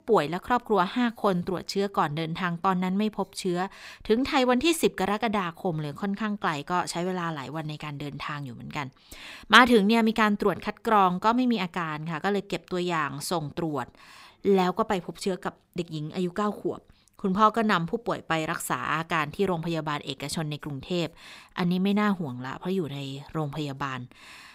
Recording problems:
none

